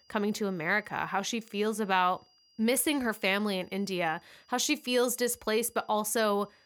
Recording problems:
high-pitched whine; faint; throughout; 5 kHz, 35 dB below the speech

